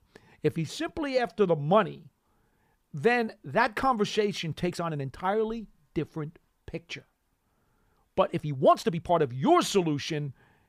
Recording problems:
uneven, jittery; strongly; from 1 to 9 s

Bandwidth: 15 kHz